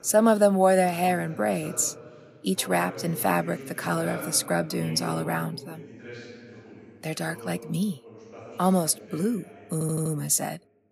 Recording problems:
voice in the background; noticeable; throughout; 15 dB below the speech
audio stuttering; at 9.5 s

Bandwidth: 15.5 kHz